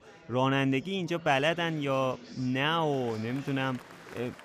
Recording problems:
chatter from many people; noticeable; throughout; 20 dB below the speech

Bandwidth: 15 kHz